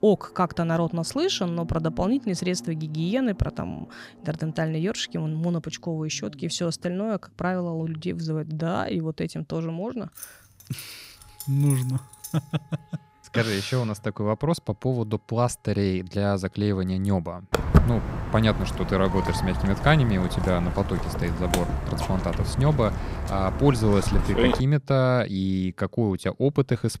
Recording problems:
background music; faint; throughout; 20 dB below the speech
jangling keys; noticeable; from 10 to 12 s; peak 10 dB below the speech
footsteps; loud; from 18 to 25 s; peak 5 dB above the speech

